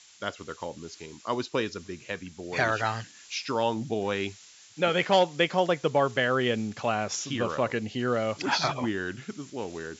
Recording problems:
high frequencies cut off; noticeable; nothing above 8 kHz
hiss; faint; throughout; 25 dB below the speech

